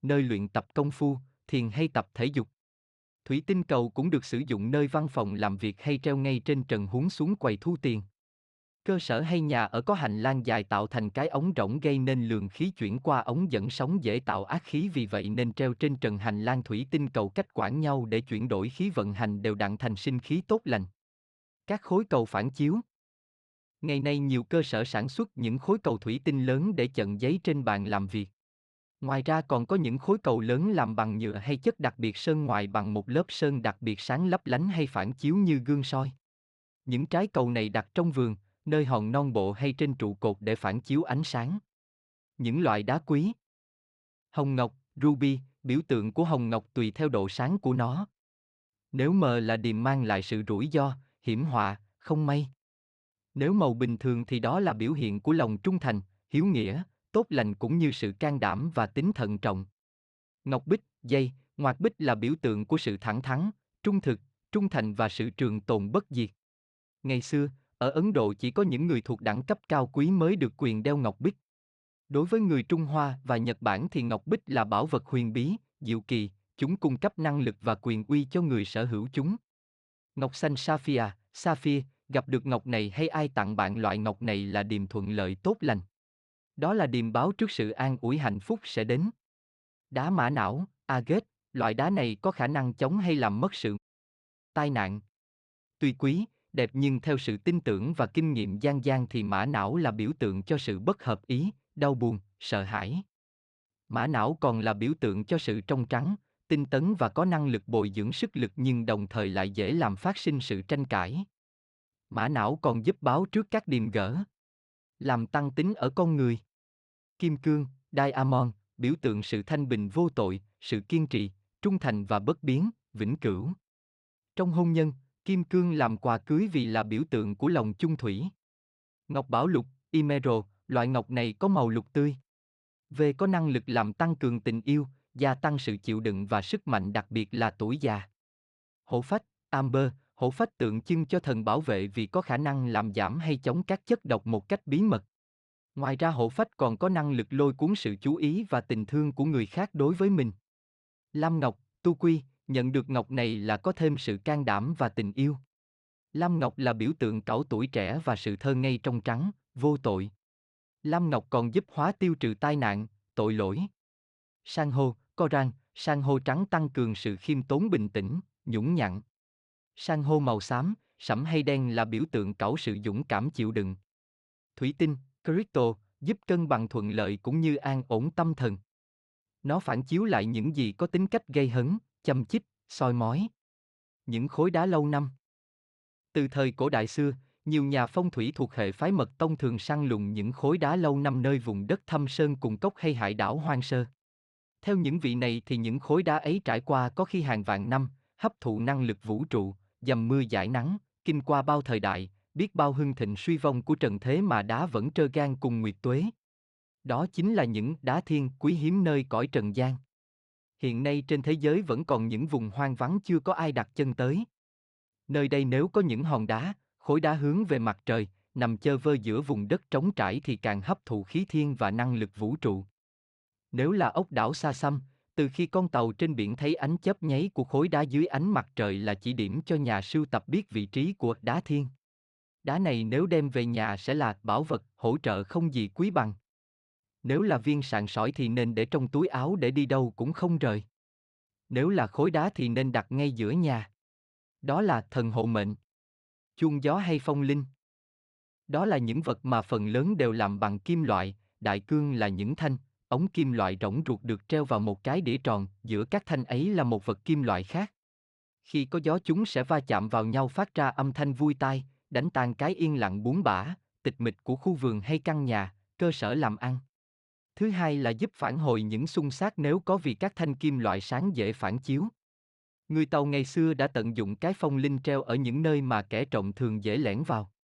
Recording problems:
audio cutting out; at 1:34 for 1 s

